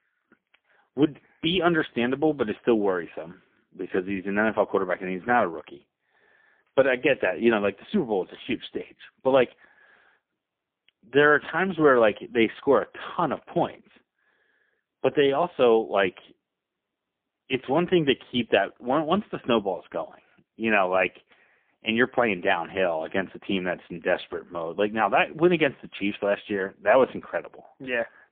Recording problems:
phone-call audio; poor line; nothing above 3.5 kHz

